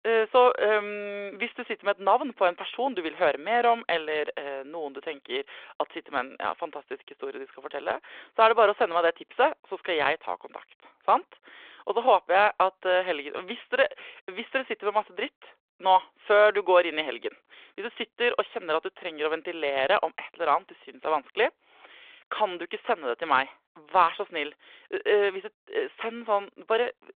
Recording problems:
phone-call audio

